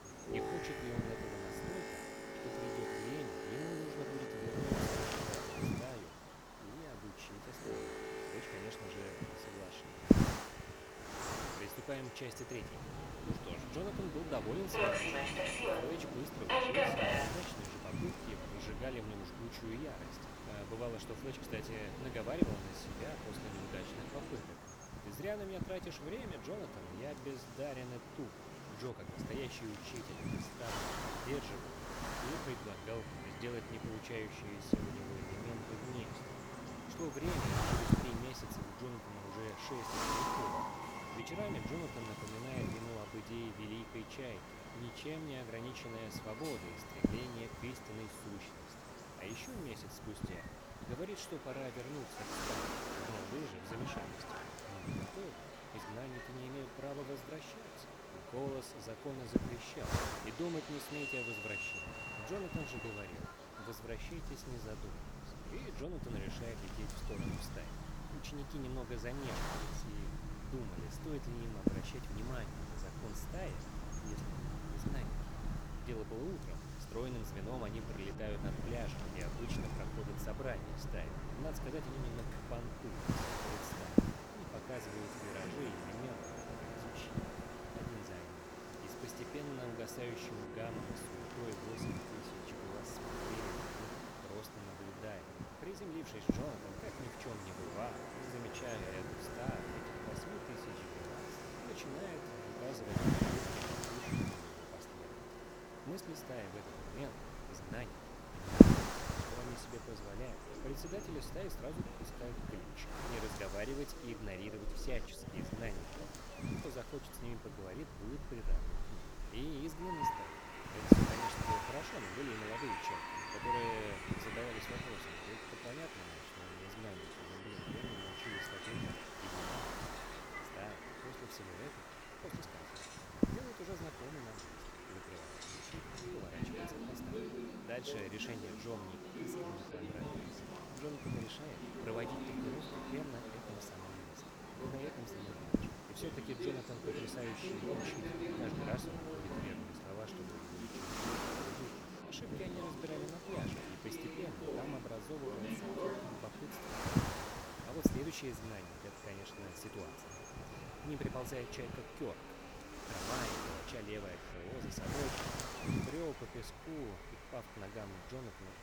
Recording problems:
train or aircraft noise; very loud; throughout; 1 dB above the speech
wind noise on the microphone; heavy; 2 dB above the speech

